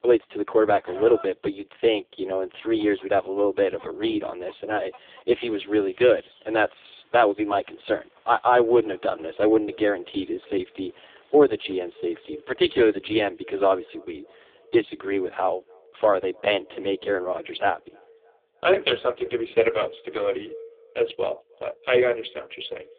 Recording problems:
phone-call audio; poor line
thin; very; fading below 300 Hz
echo of what is said; faint; from 9 s on; 310 ms later, 25 dB below the speech
animal sounds; faint; until 13 s; 25 dB below the speech

